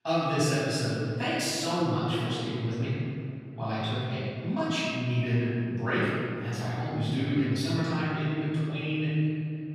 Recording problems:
room echo; strong; dies away in 2.7 s
off-mic speech; far

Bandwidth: 14.5 kHz